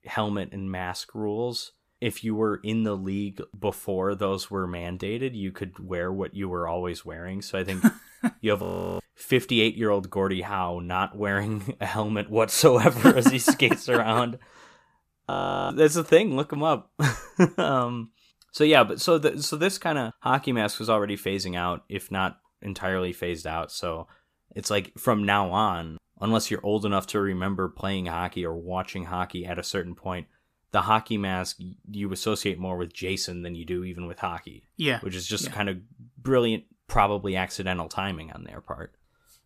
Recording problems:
audio freezing; at 8.5 s and at 15 s

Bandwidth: 14.5 kHz